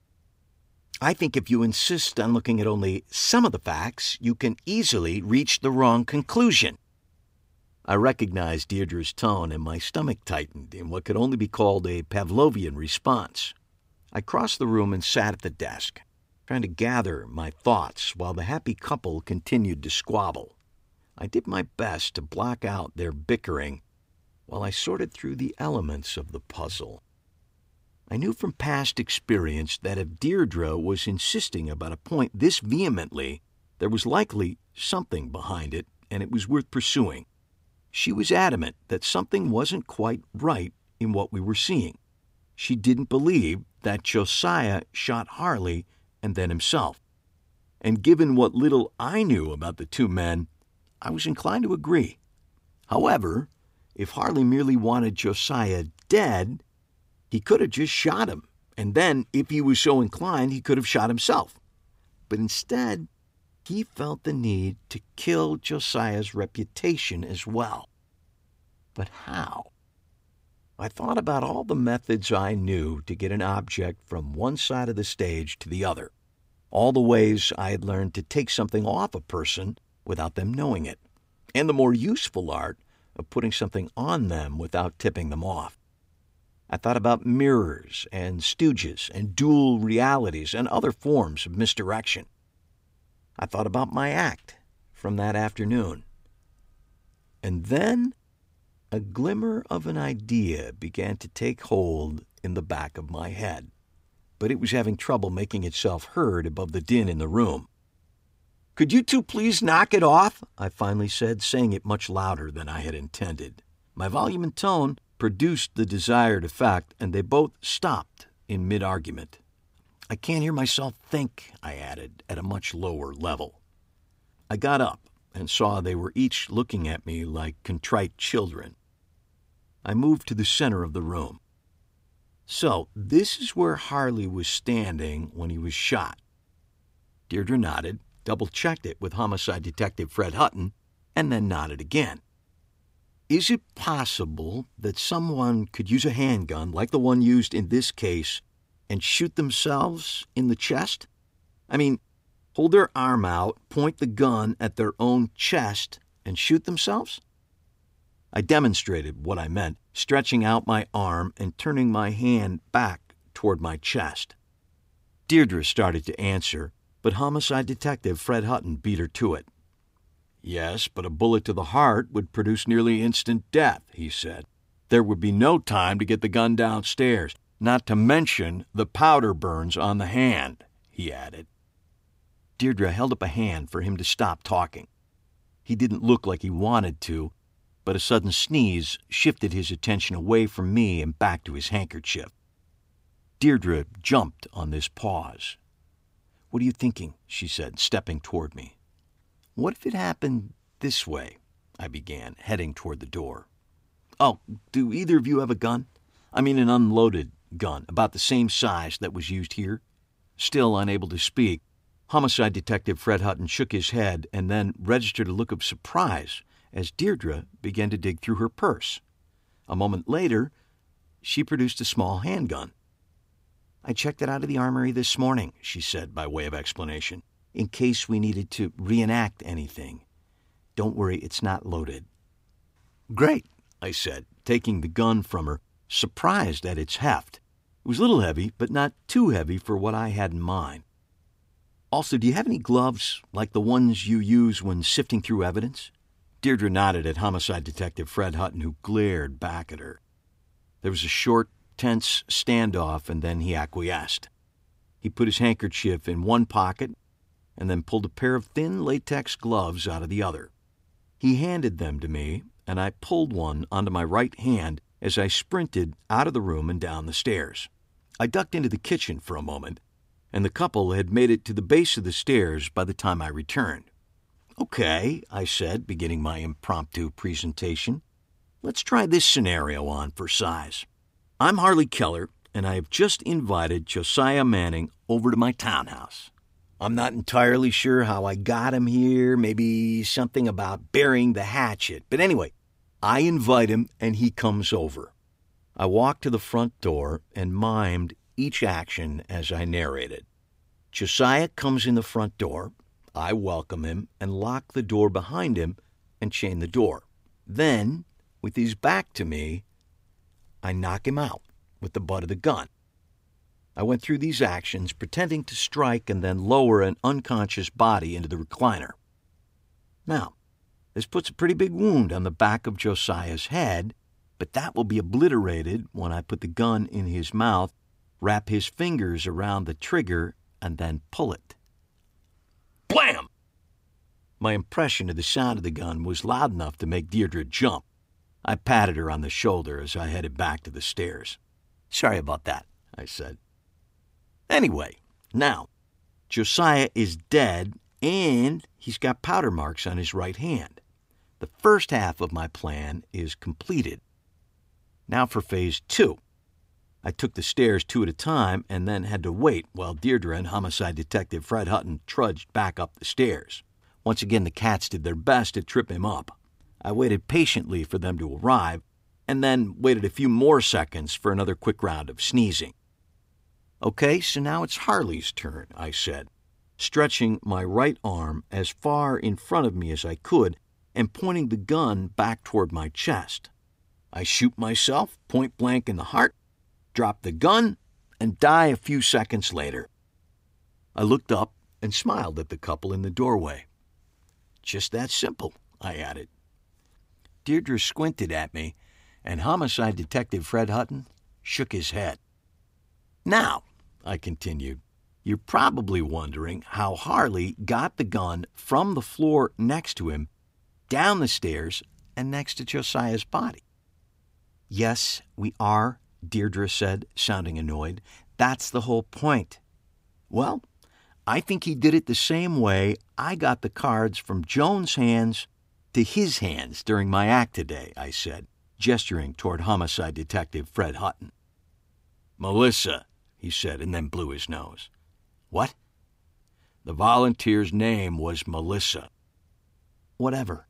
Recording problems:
none

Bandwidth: 15.5 kHz